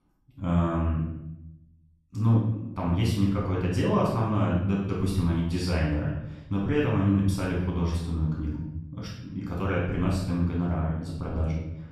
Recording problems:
off-mic speech; far
room echo; noticeable; dies away in 0.8 s

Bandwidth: 13.5 kHz